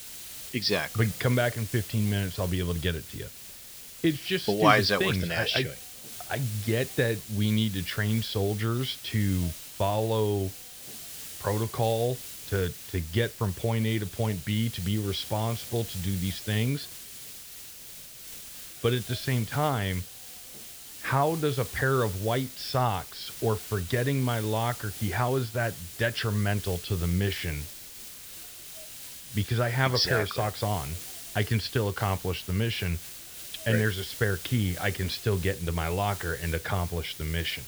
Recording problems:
high frequencies cut off; noticeable; nothing above 6 kHz
hiss; noticeable; throughout; 10 dB below the speech

